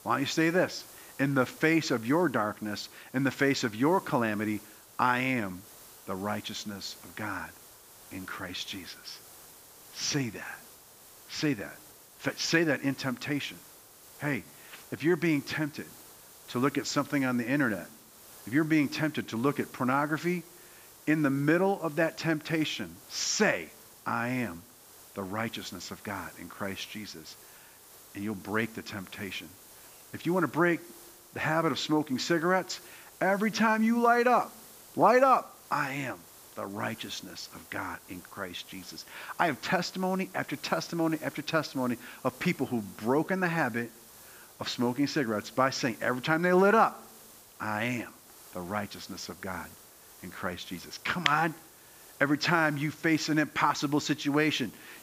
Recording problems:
high frequencies cut off; noticeable; nothing above 7.5 kHz
hiss; faint; throughout; 20 dB below the speech

